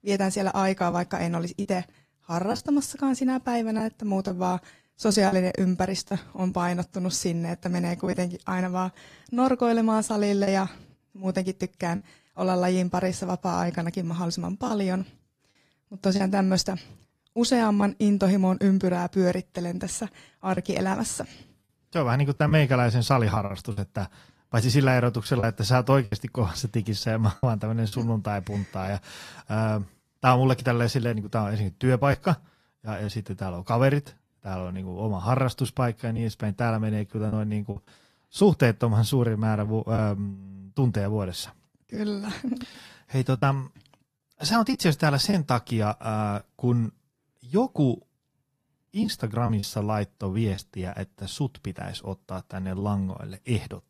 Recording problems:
garbled, watery; slightly; nothing above 14.5 kHz
choppy; occasionally; 3% of the speech affected

